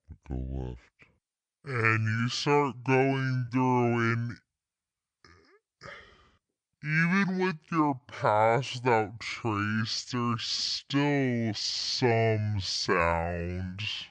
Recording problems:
wrong speed and pitch; too slow and too low; 0.6 times normal speed
uneven, jittery; strongly; from 1.5 to 13 s

